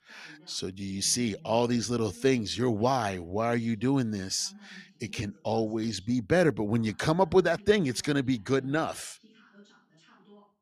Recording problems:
voice in the background; faint; throughout; 30 dB below the speech

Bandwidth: 14.5 kHz